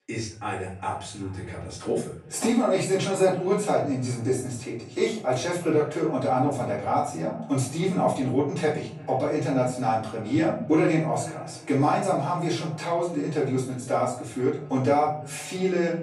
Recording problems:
off-mic speech; far
room echo; noticeable; dies away in 0.8 s
echo of what is said; faint; throughout; 340 ms later, 20 dB below the speech

